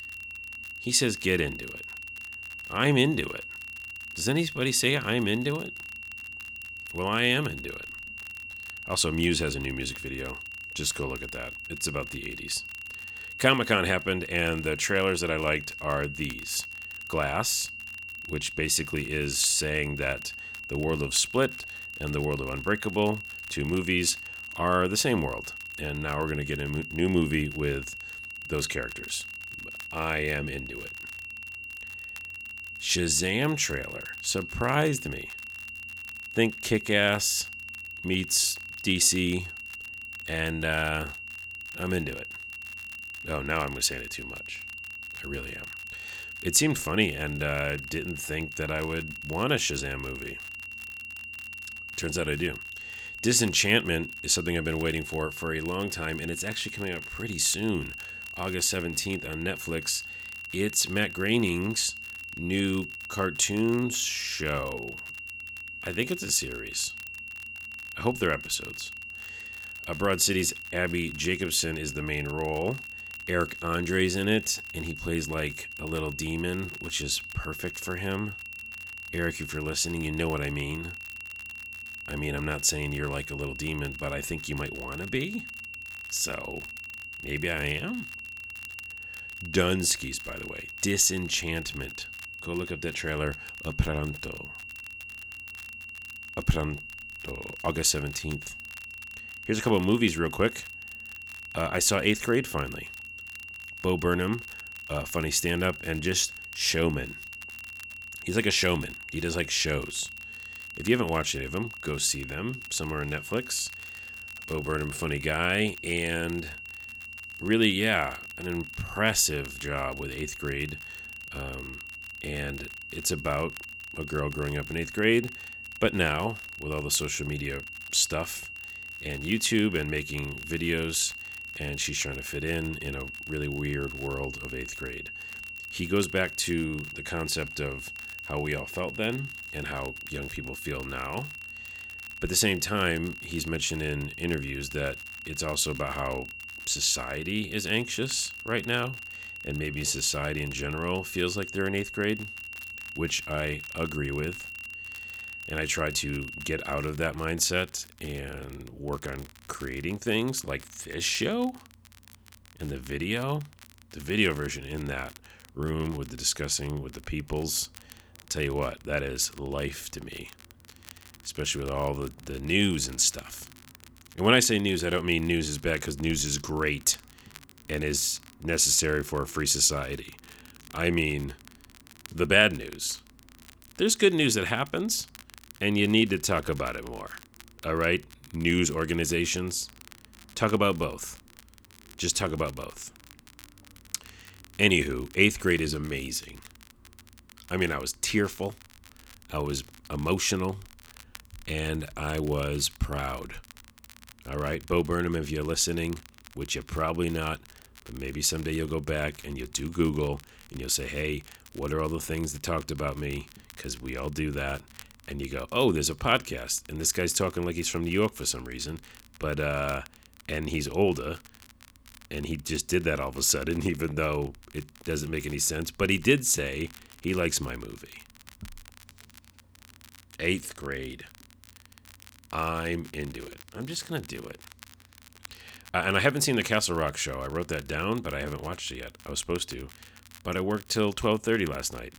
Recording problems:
high-pitched whine; loud; until 2:37; 2.5 kHz, 10 dB below the speech
crackle, like an old record; faint; 25 dB below the speech

